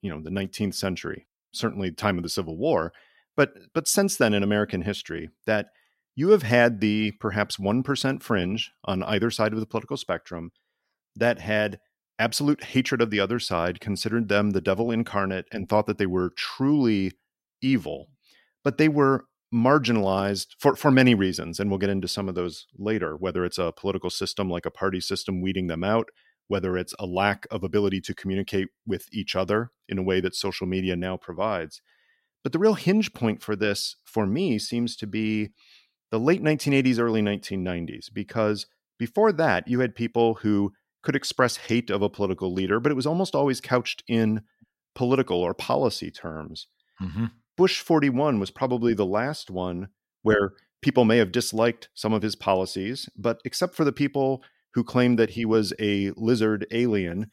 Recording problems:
none

